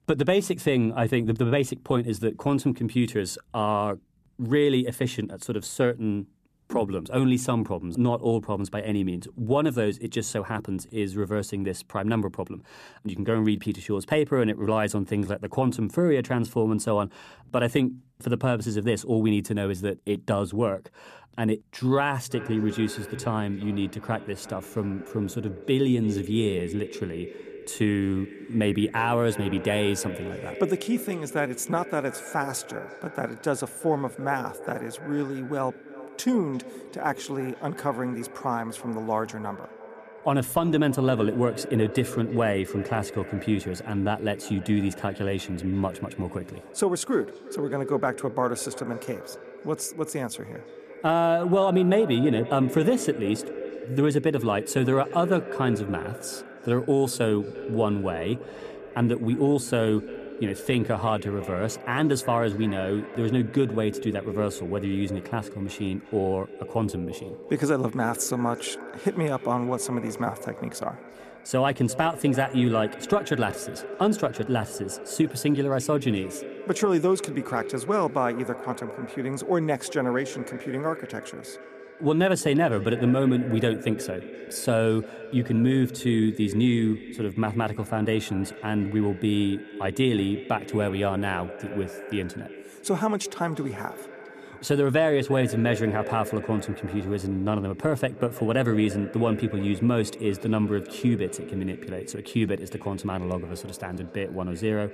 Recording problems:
echo of what is said; noticeable; from 22 s on; 350 ms later, 15 dB below the speech

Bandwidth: 14.5 kHz